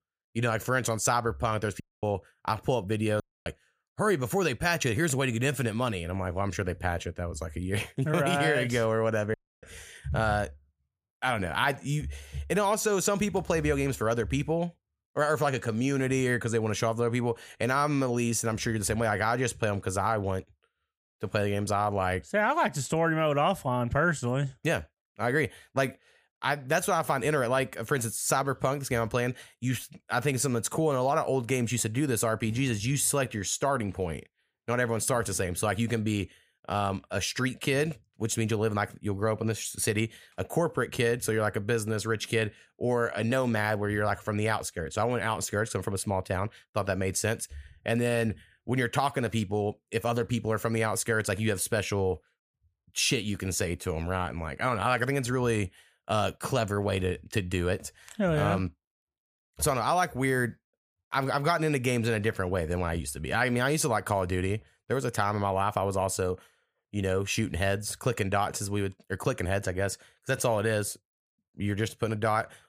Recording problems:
audio cutting out; at 2 s, at 3 s and at 9.5 s

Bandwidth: 15 kHz